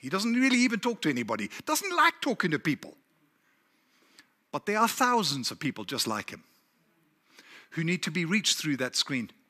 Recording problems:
none

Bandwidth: 14.5 kHz